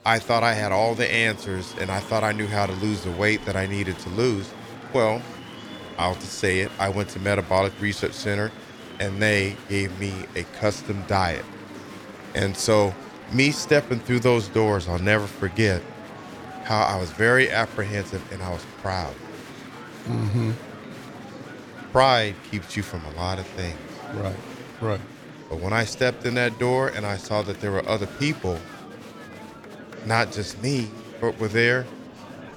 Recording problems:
murmuring crowd; noticeable; throughout; 15 dB below the speech

